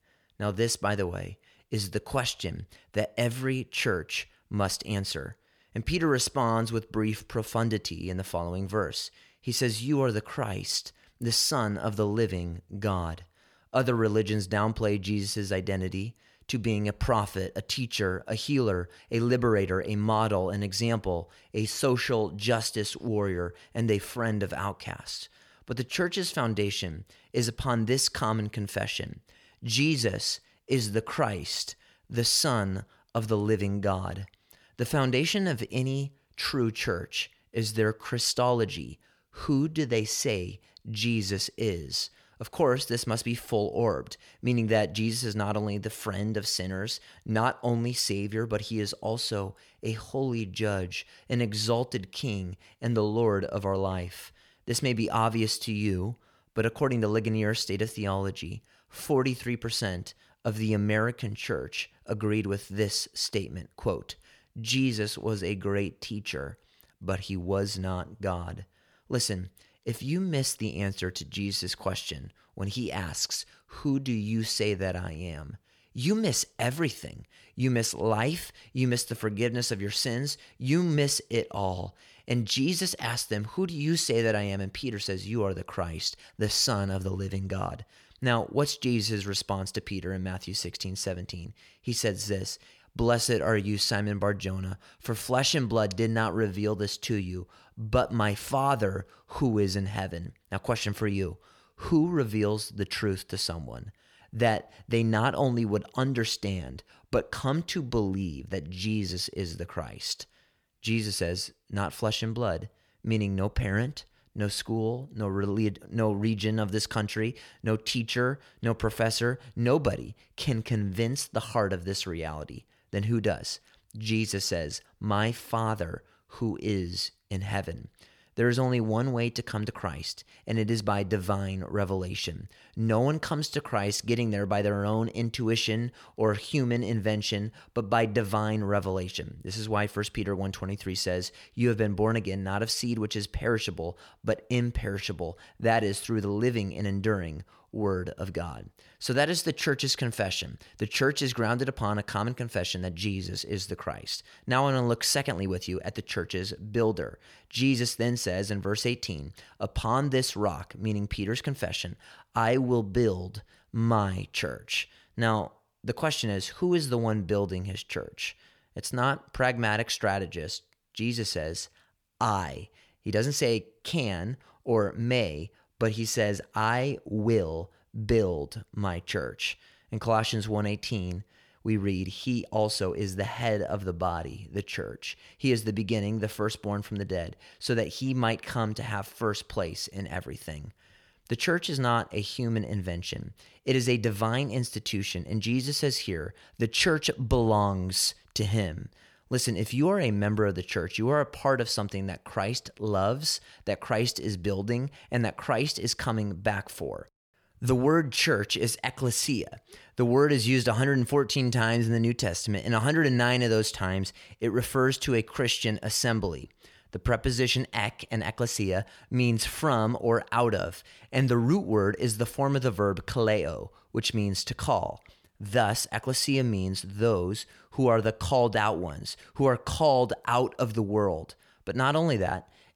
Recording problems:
none

